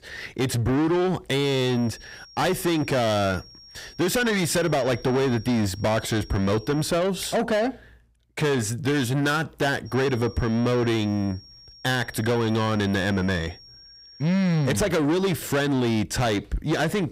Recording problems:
distortion; heavy; 8 dB below the speech
high-pitched whine; faint; from 1.5 to 7 s and from 10 to 15 s; 5.5 kHz, 20 dB below the speech

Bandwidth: 15.5 kHz